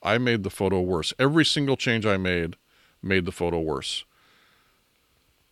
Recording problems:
none

